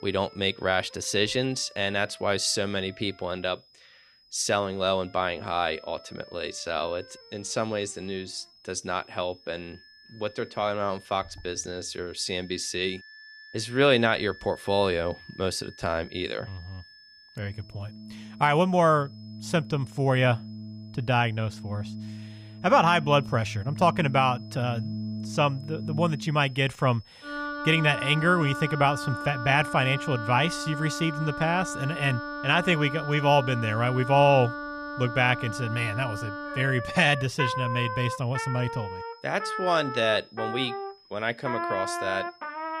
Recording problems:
background music; loud; throughout; 9 dB below the speech
high-pitched whine; faint; throughout; 5 kHz, 25 dB below the speech

